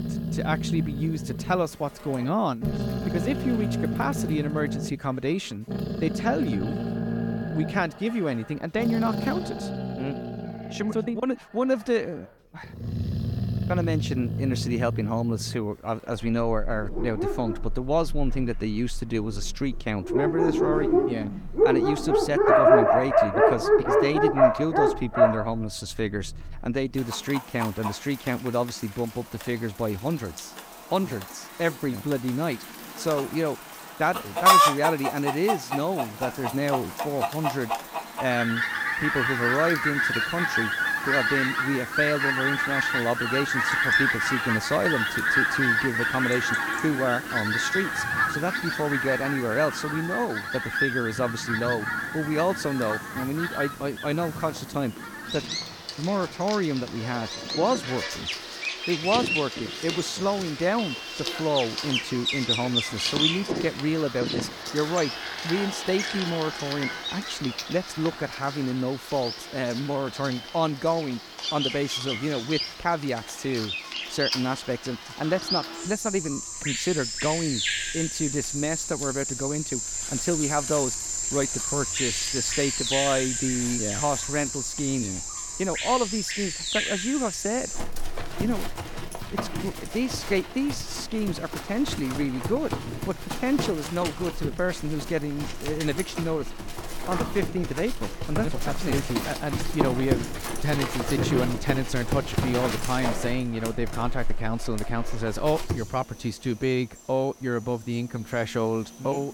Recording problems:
animal sounds; very loud; throughout; 1 dB above the speech

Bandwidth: 17.5 kHz